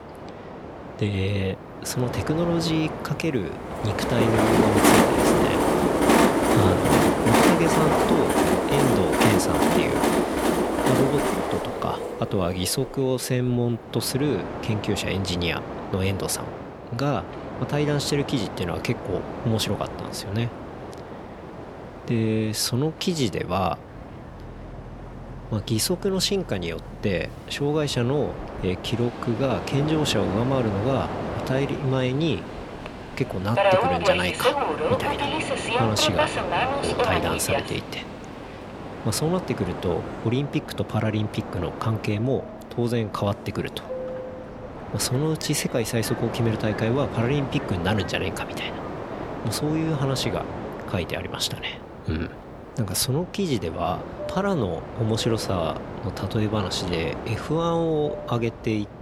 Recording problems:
train or aircraft noise; very loud; throughout; as loud as the speech

